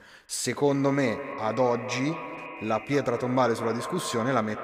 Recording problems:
echo of what is said; strong; throughout; 210 ms later, 10 dB below the speech

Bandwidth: 15.5 kHz